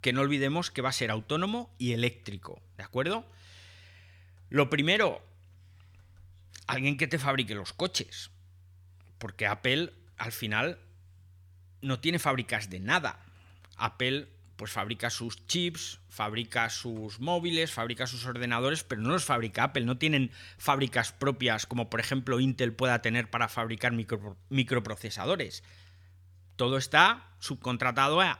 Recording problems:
none

